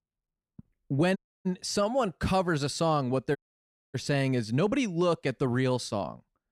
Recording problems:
audio cutting out; at 1 s and at 3.5 s for 0.5 s

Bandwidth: 14.5 kHz